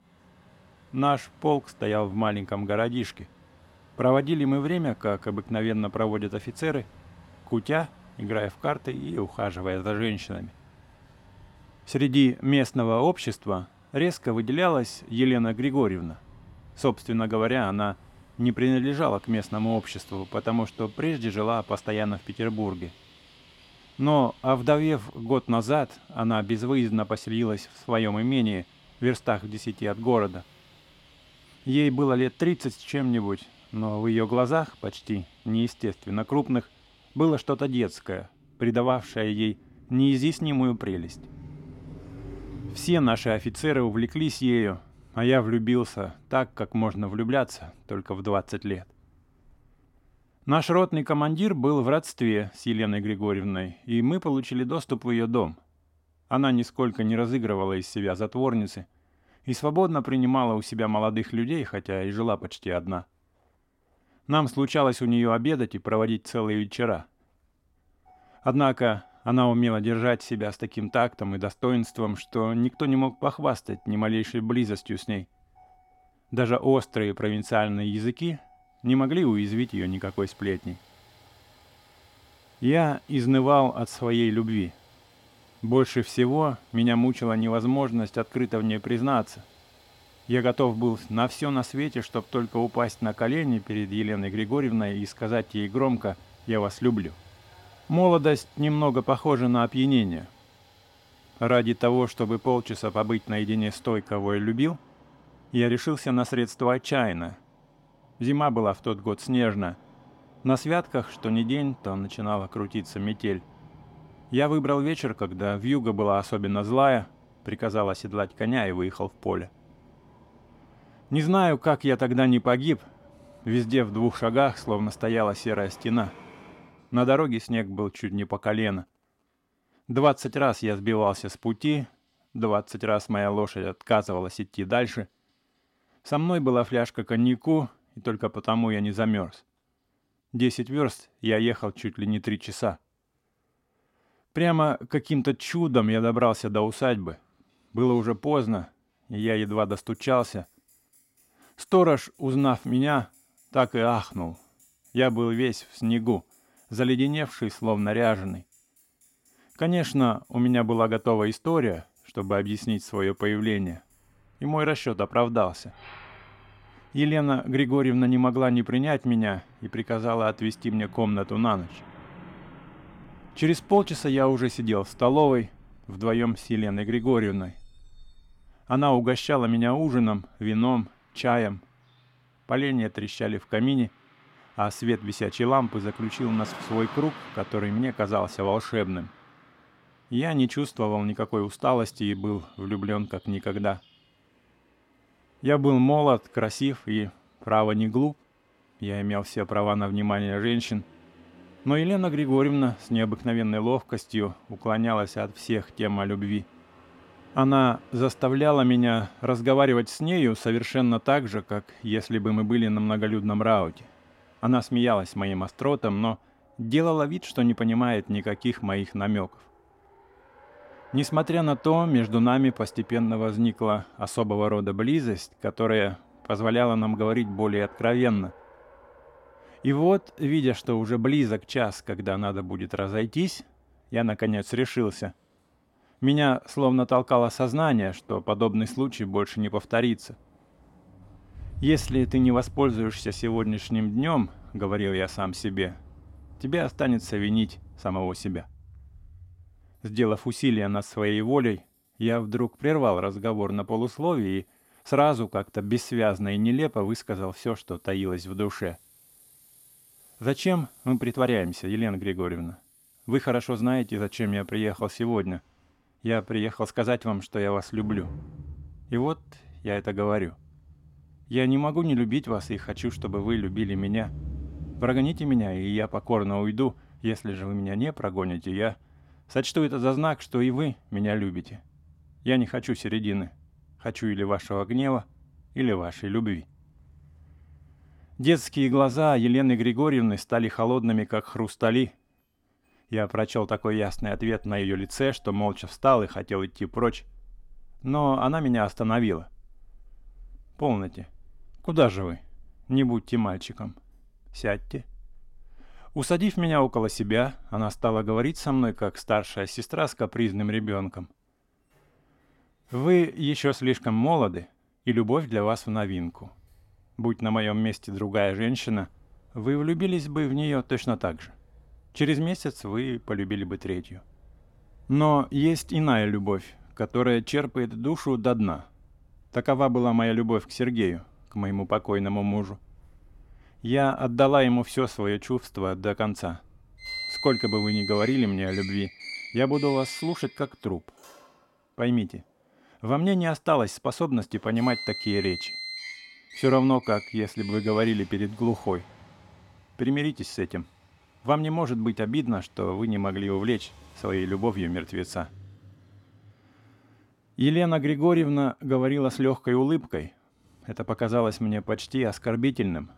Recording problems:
traffic noise; faint; throughout; 20 dB below the speech

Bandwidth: 16.5 kHz